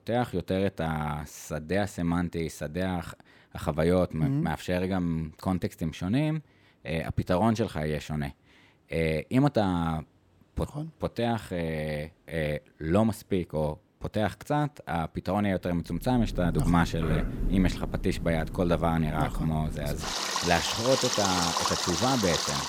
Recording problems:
rain or running water; loud; from 16 s on; 2 dB below the speech

